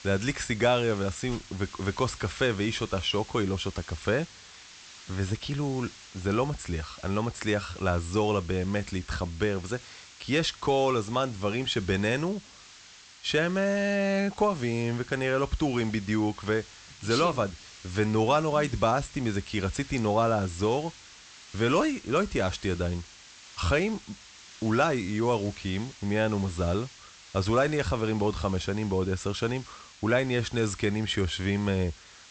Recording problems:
high frequencies cut off; noticeable; nothing above 8 kHz
hiss; noticeable; throughout; 20 dB below the speech

